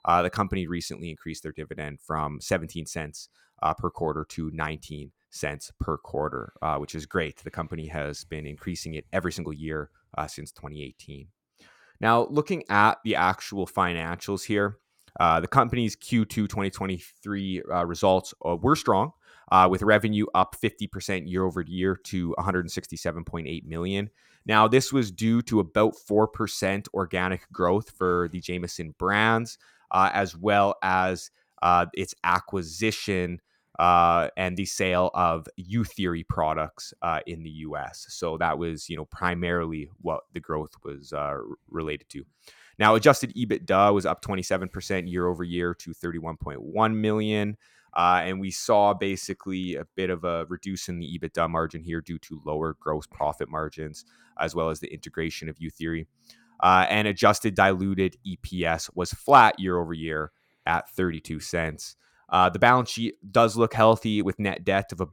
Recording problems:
none

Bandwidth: 17 kHz